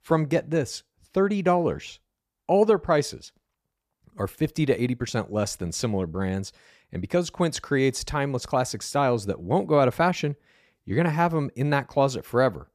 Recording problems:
none

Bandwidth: 14.5 kHz